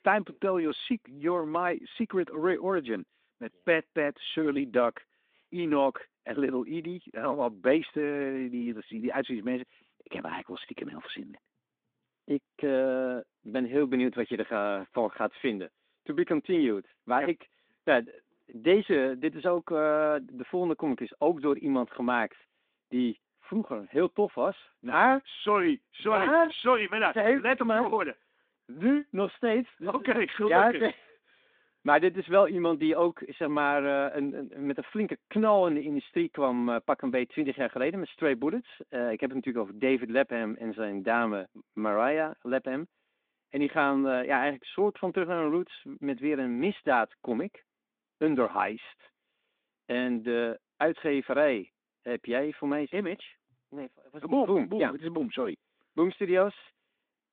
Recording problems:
phone-call audio; nothing above 3.5 kHz

